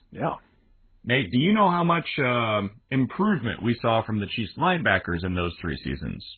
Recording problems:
garbled, watery; badly; nothing above 4 kHz

